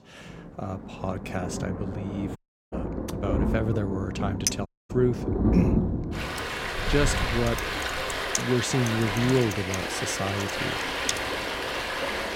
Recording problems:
rain or running water; very loud; throughout; as loud as the speech
audio cutting out; at 2.5 s and at 4.5 s
clattering dishes; very faint; at 4.5 s; peak 1 dB above the speech
keyboard typing; noticeable; from 7.5 to 11 s; peak 2 dB below the speech

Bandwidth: 16 kHz